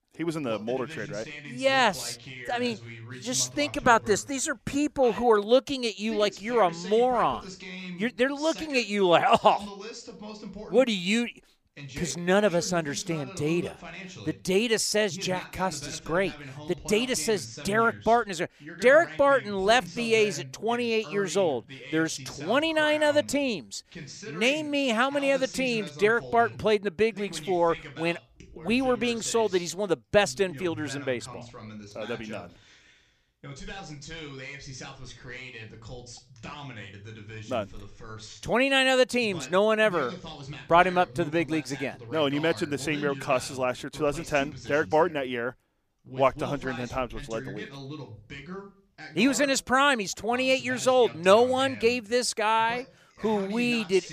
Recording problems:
voice in the background; noticeable; throughout; 15 dB below the speech

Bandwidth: 15 kHz